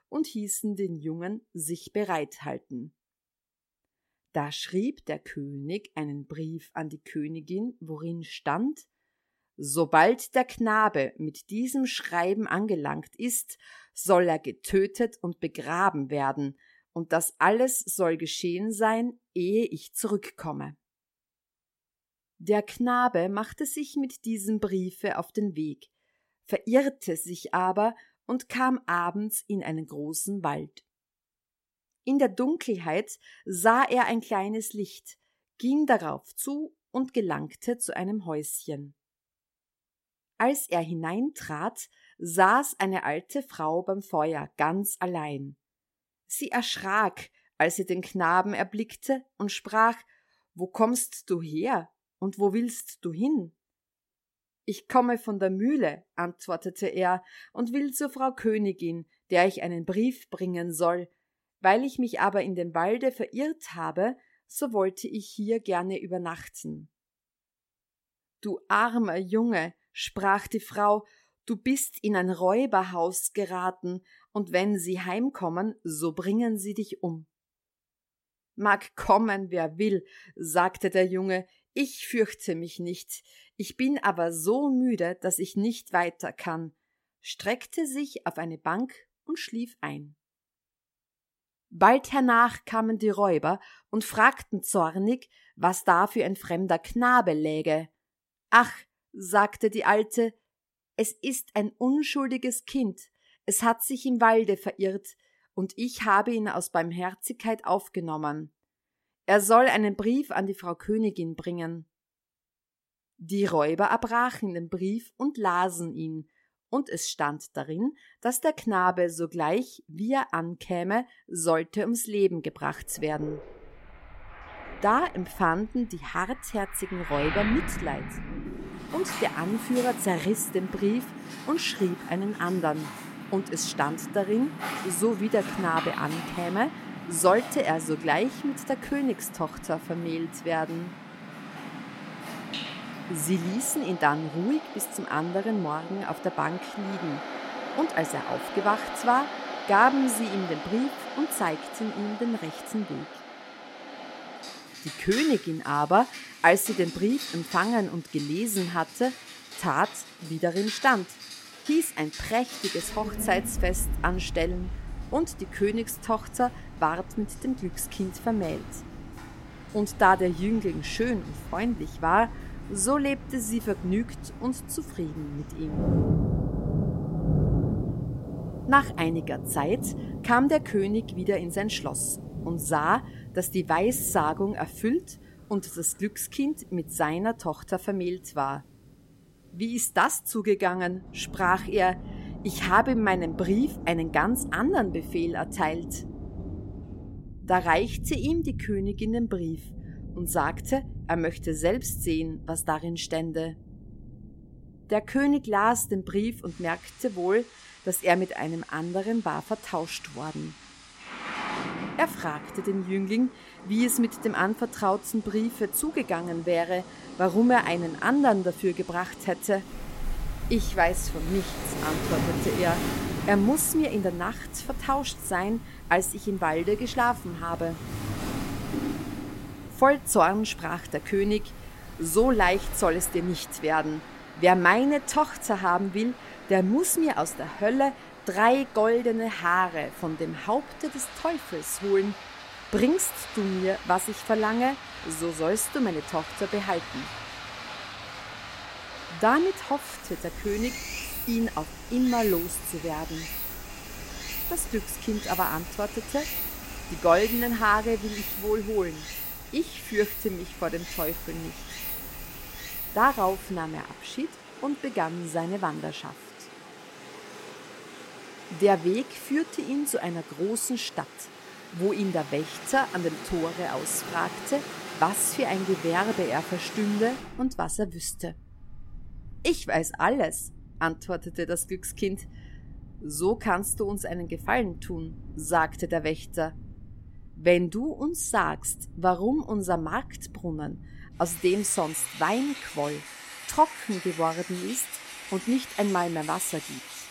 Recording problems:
rain or running water; noticeable; from 2:03 on; 10 dB below the speech

